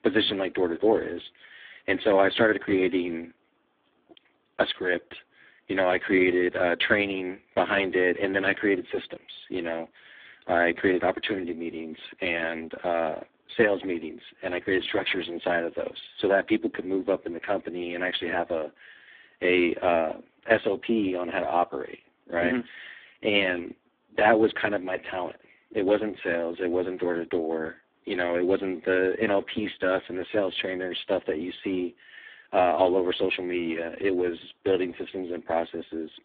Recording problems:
phone-call audio; poor line

